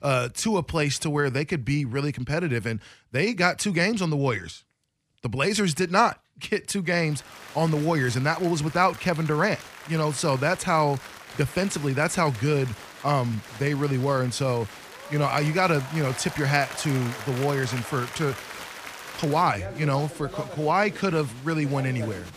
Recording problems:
crowd noise; noticeable; from 7 s on; 15 dB below the speech

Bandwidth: 15 kHz